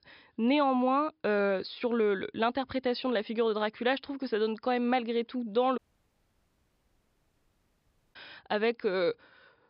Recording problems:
high frequencies cut off; noticeable; nothing above 5.5 kHz
audio cutting out; at 6 s for 2.5 s

